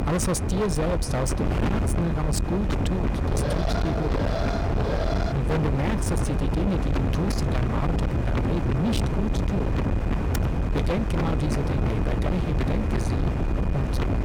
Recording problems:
distortion; heavy; 46% of the sound clipped
wind noise on the microphone; heavy; 1 dB below the speech
high-pitched whine; faint; throughout; 2.5 kHz, 25 dB below the speech
alarm; noticeable; from 3.5 to 5.5 s; peak 1 dB below the speech
keyboard typing; noticeable; at 10 s; peak 9 dB below the speech

